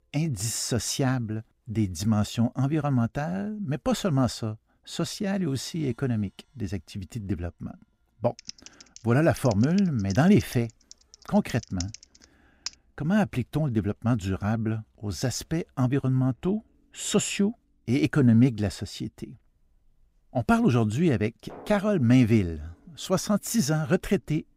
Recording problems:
background music; faint; throughout; 30 dB below the speech
keyboard typing; faint; from 8.5 to 13 s; peak 10 dB below the speech

